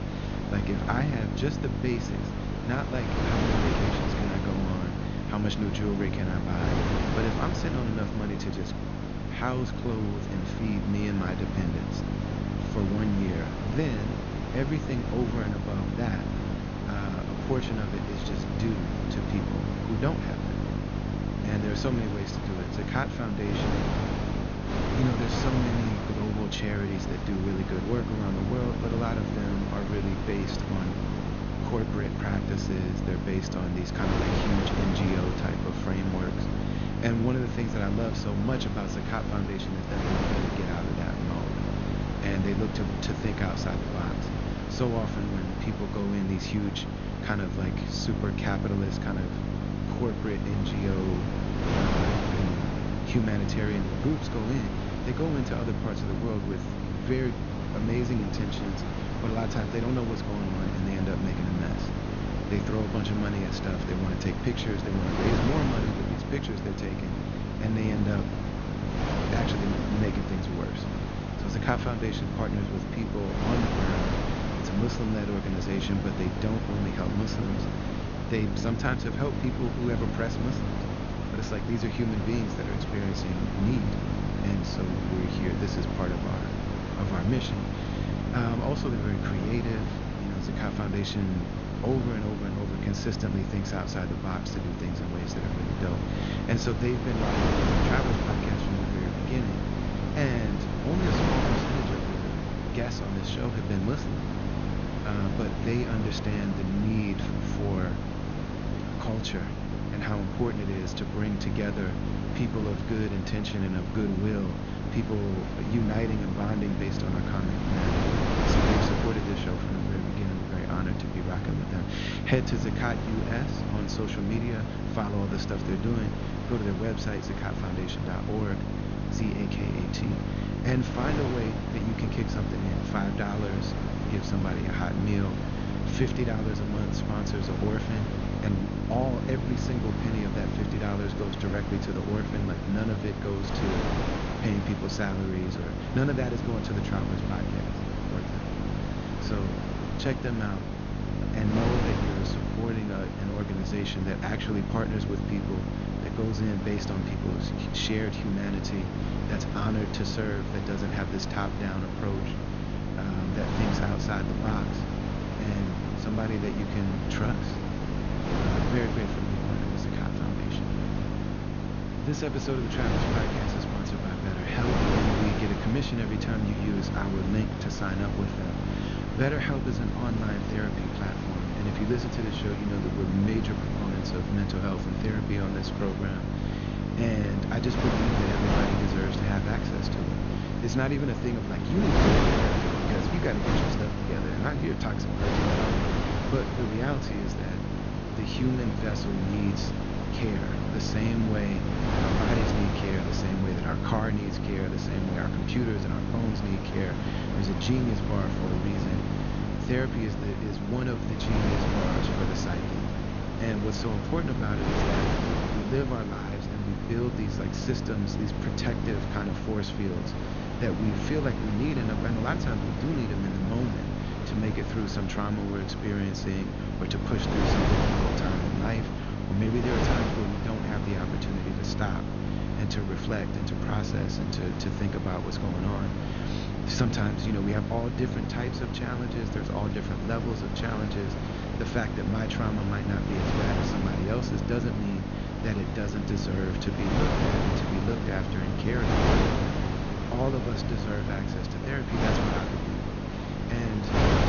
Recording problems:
high frequencies cut off; noticeable; nothing above 6.5 kHz
wind noise on the microphone; heavy; 1 dB below the speech
electrical hum; loud; throughout; 50 Hz, 5 dB below the speech

